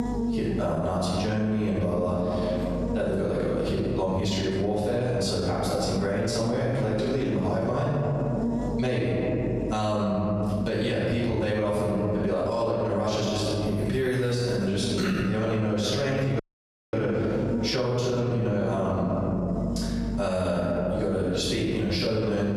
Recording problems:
room echo; strong; dies away in 1.9 s
off-mic speech; far
squashed, flat; somewhat
electrical hum; noticeable; throughout; 50 Hz, 15 dB below the speech
audio cutting out; at 16 s for 0.5 s

